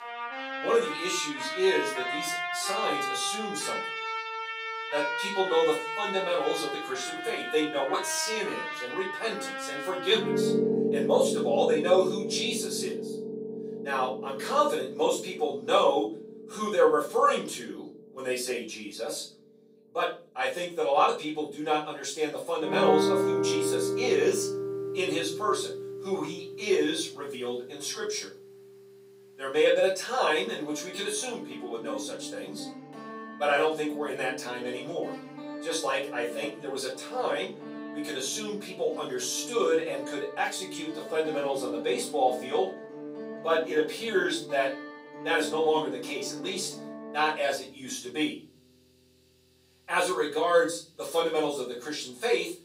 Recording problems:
off-mic speech; far
thin; somewhat; fading below 350 Hz
room echo; slight; dies away in 0.5 s
background music; loud; throughout; 5 dB below the speech

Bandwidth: 15.5 kHz